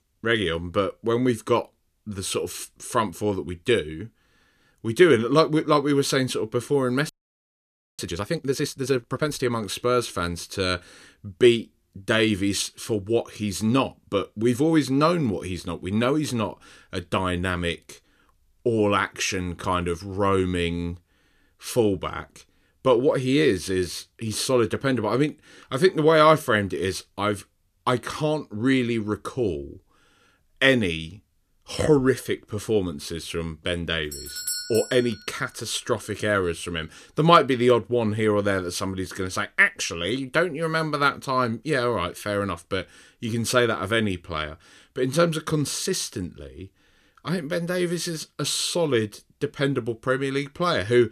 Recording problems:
audio freezing; at 7 s for 1 s
doorbell; noticeable; at 34 s; peak 4 dB below the speech

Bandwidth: 14.5 kHz